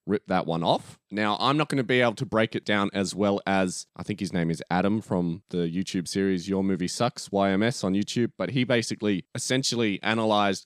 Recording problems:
none

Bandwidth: 15 kHz